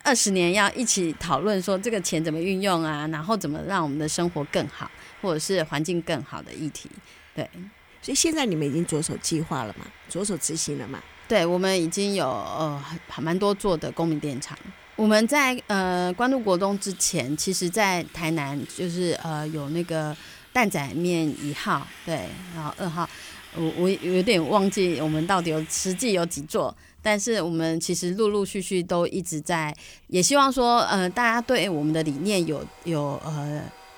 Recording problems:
household noises; faint; throughout; 20 dB below the speech

